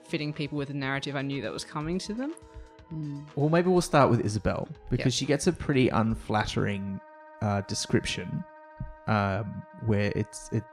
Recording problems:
background music; faint; throughout; 25 dB below the speech

